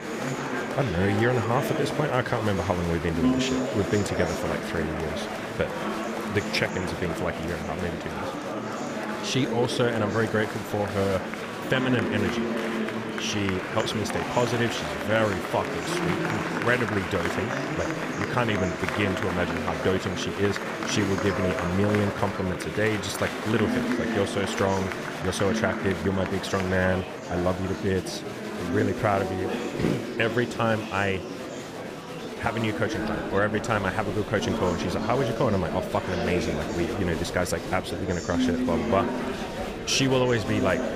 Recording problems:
murmuring crowd; loud; throughout; 3 dB below the speech

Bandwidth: 15 kHz